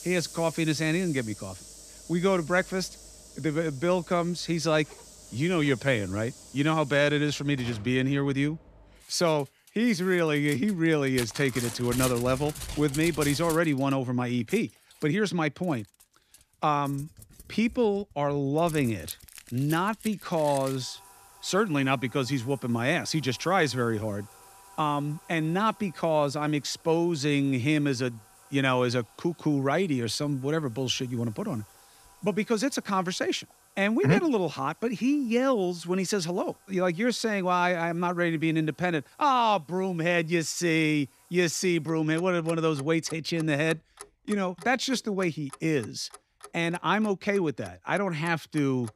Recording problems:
household noises; noticeable; throughout; 15 dB below the speech

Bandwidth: 14.5 kHz